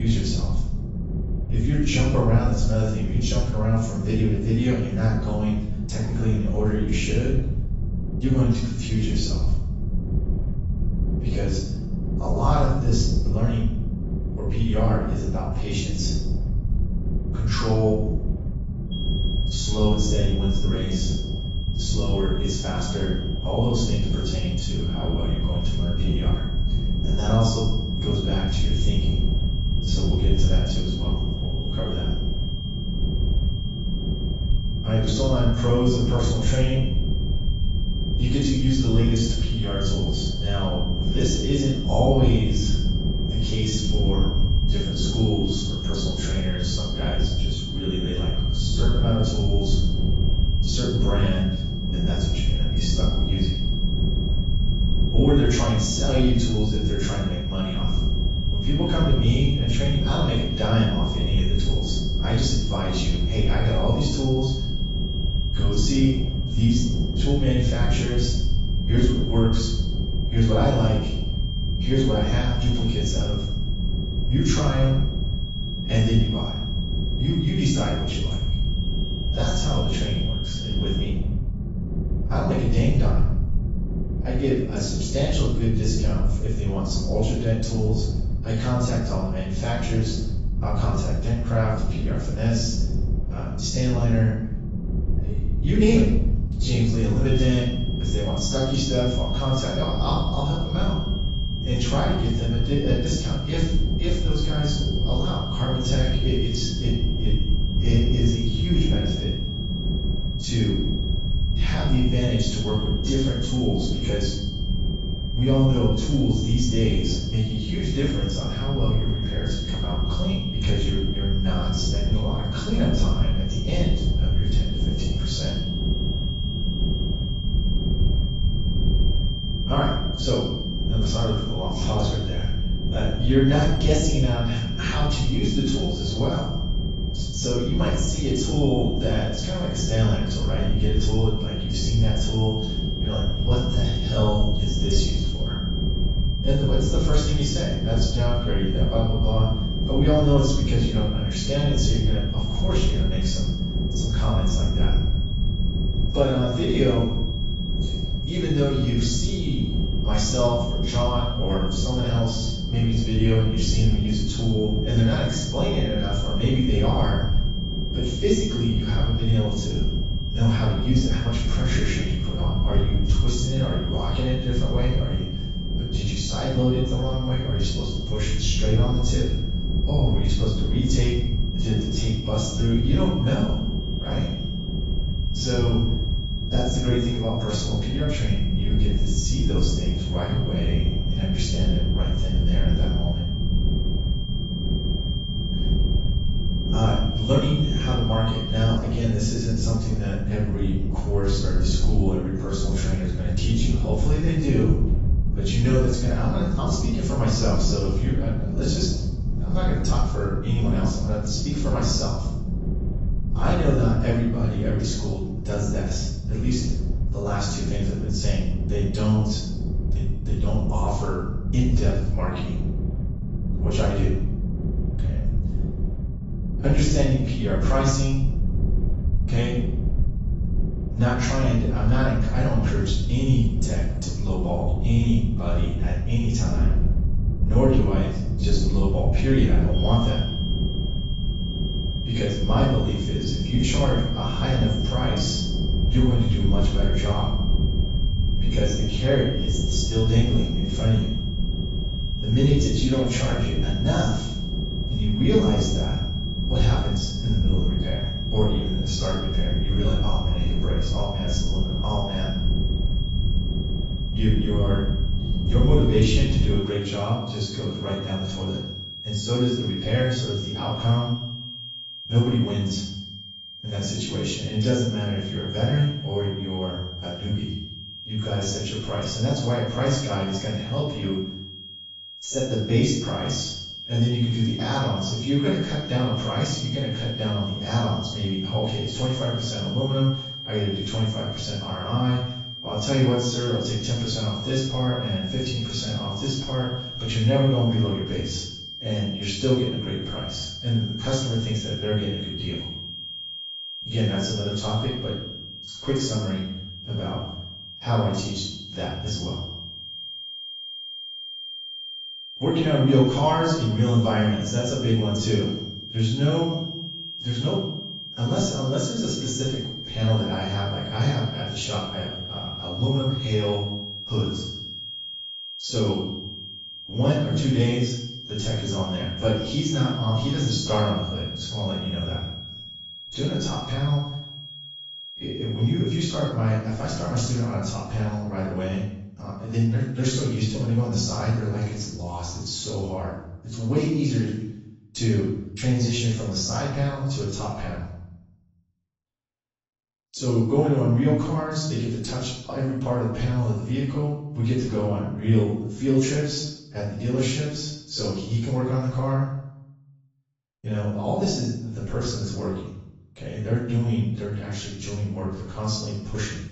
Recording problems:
off-mic speech; far
garbled, watery; badly; nothing above 7.5 kHz
room echo; noticeable; dies away in 0.7 s
high-pitched whine; loud; from 19 s to 1:21, from 1:37 to 3:19 and from 4:00 to 5:36; 3 kHz, 9 dB below the speech
low rumble; loud; until 4:27; 9 dB below the speech
abrupt cut into speech; at the start

